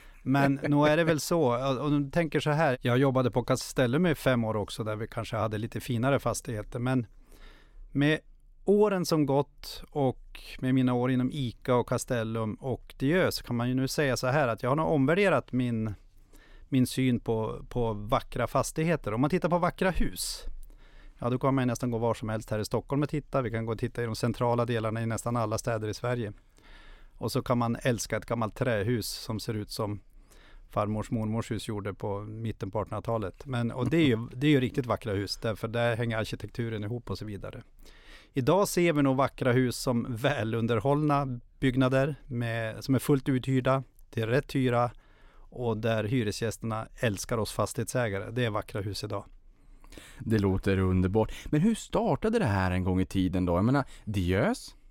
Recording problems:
none

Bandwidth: 16.5 kHz